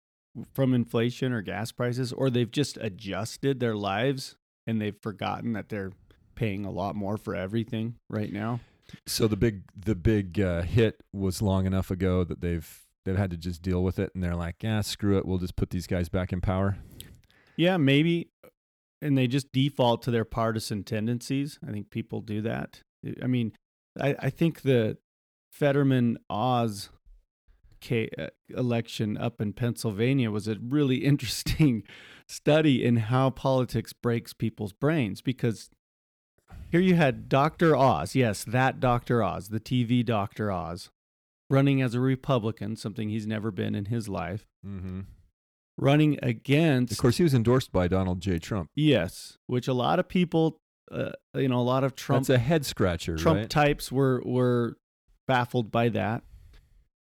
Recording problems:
none

